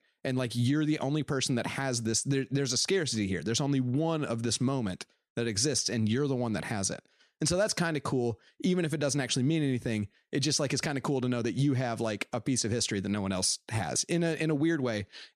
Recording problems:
none

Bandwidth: 14.5 kHz